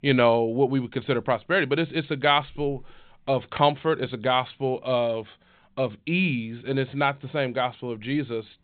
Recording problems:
high frequencies cut off; severe; nothing above 4 kHz

